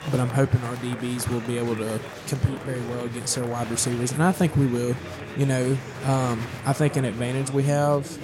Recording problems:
murmuring crowd; noticeable; throughout; 10 dB below the speech

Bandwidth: 16.5 kHz